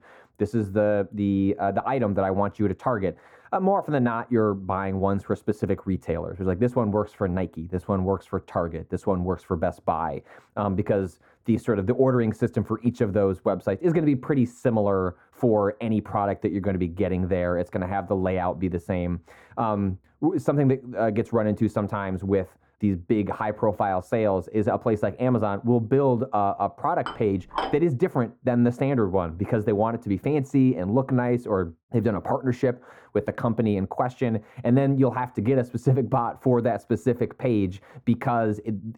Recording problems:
muffled; very; fading above 1.5 kHz
clattering dishes; noticeable; at 27 s; peak 6 dB below the speech

